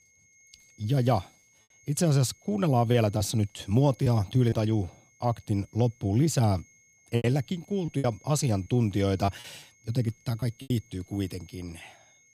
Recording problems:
high-pitched whine; faint; throughout; 2 kHz, 30 dB below the speech
choppy; very; 5% of the speech affected

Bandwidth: 15.5 kHz